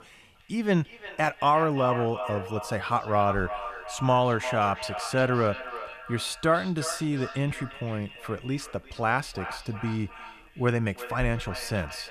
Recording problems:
echo of what is said; strong; throughout; 350 ms later, 10 dB below the speech

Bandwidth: 14 kHz